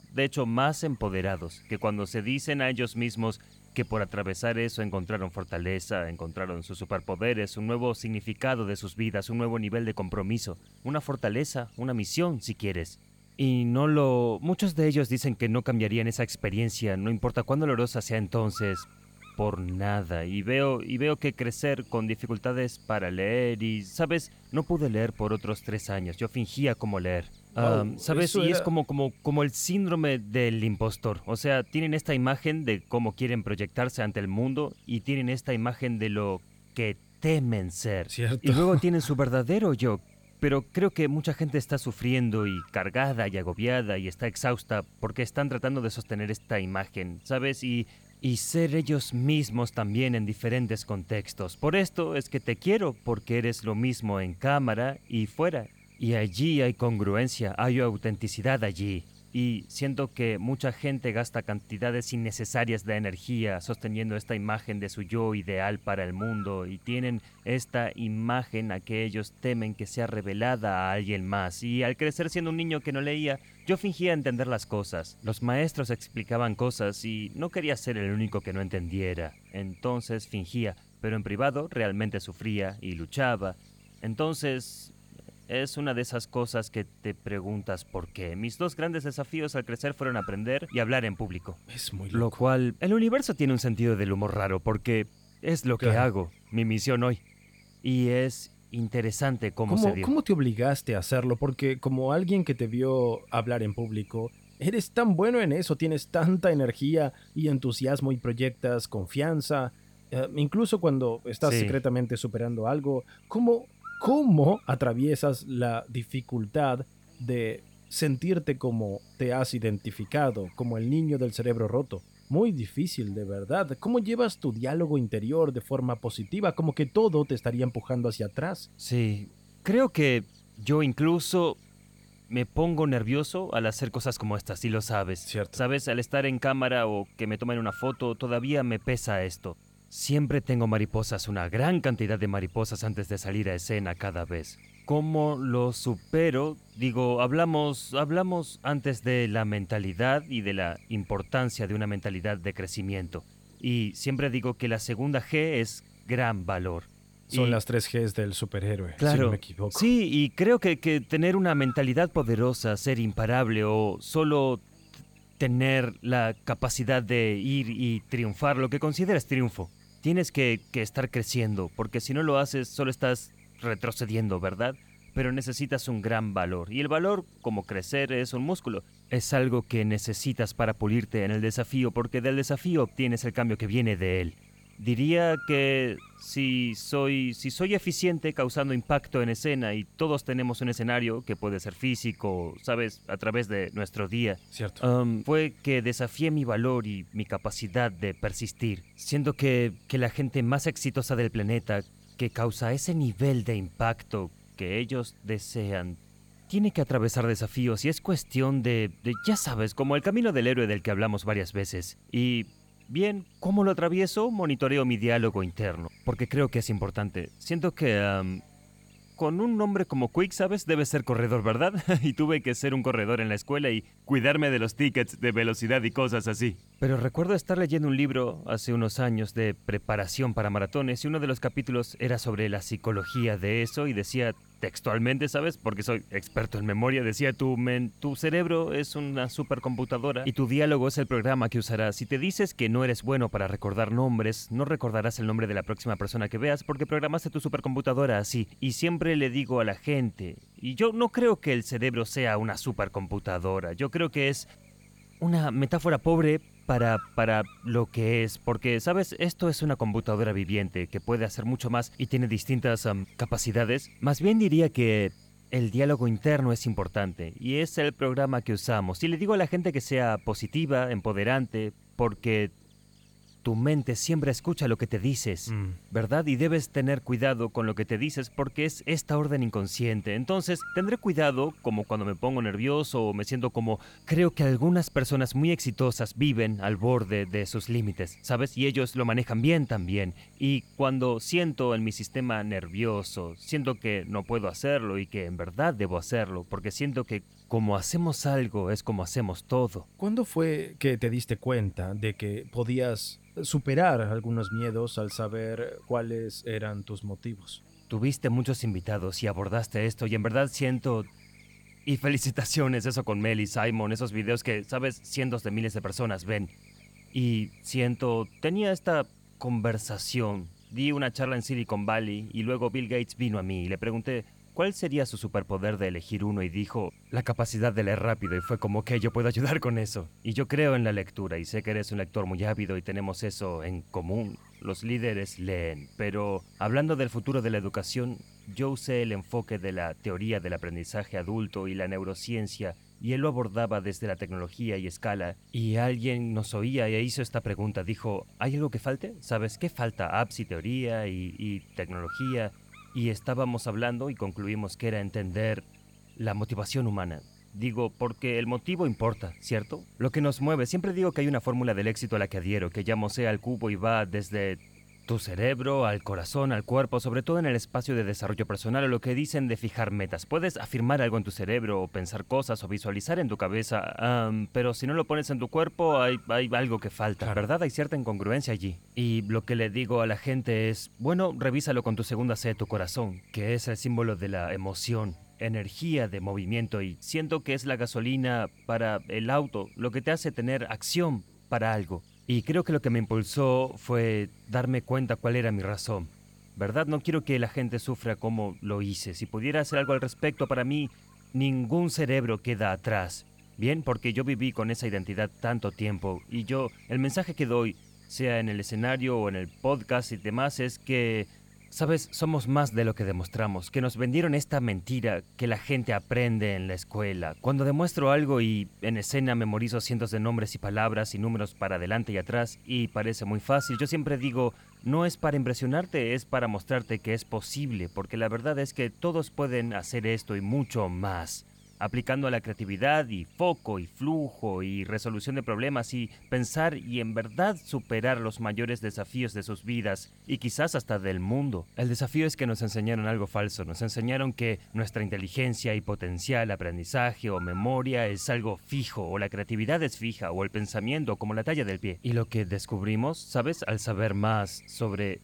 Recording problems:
electrical hum; faint; throughout; 50 Hz, 25 dB below the speech

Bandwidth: 18.5 kHz